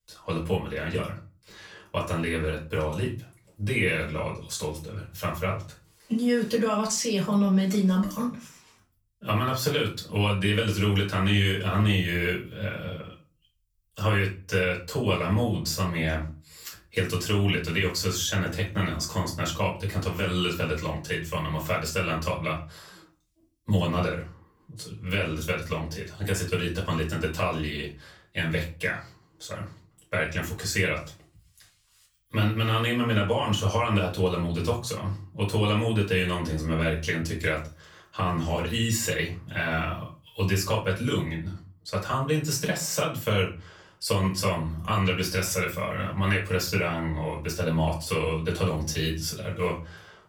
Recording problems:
off-mic speech; far
room echo; slight; dies away in 0.3 s

